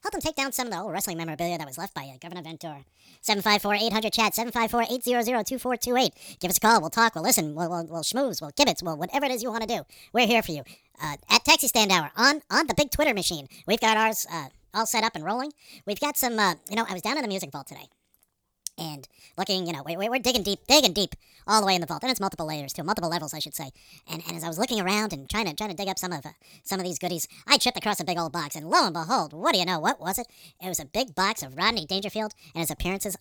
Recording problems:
wrong speed and pitch; too fast and too high; 1.6 times normal speed

